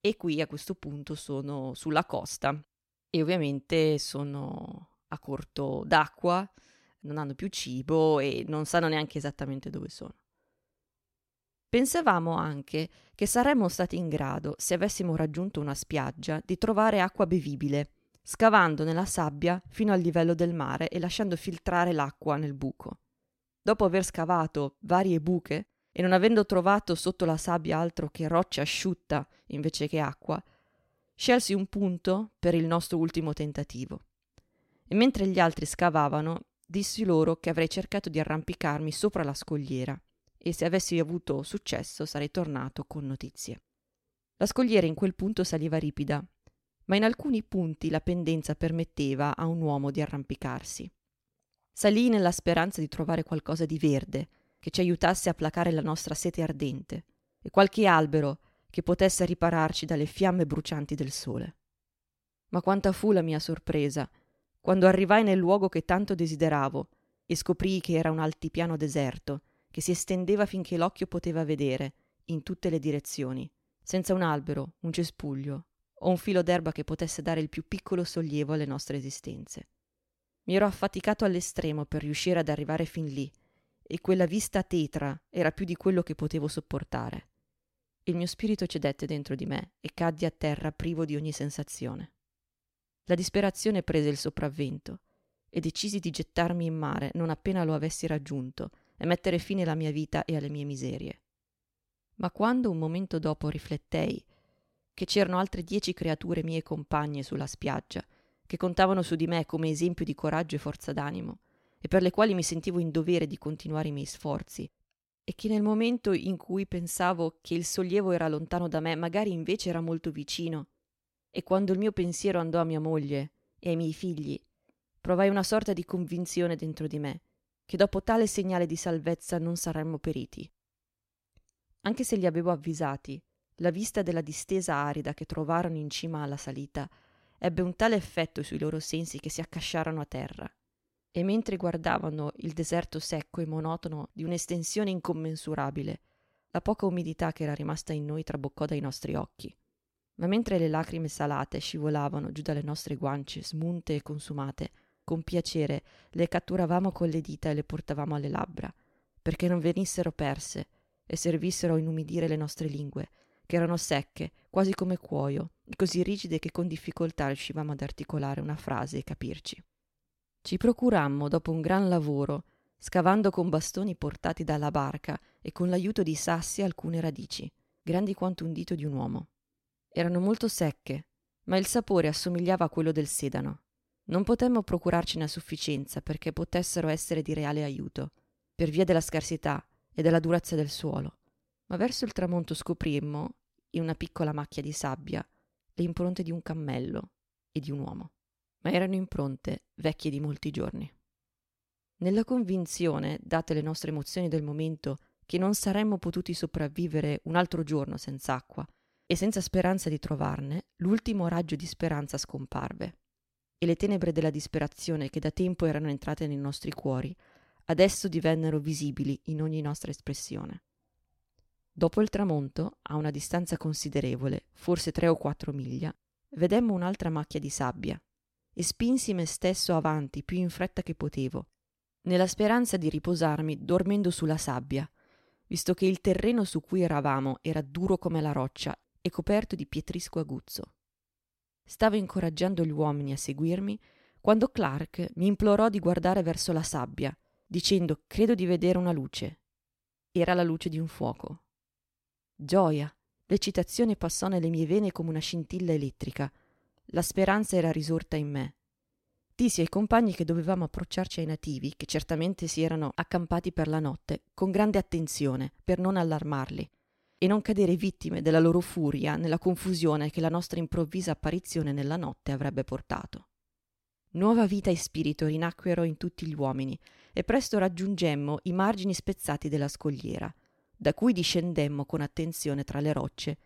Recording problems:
none

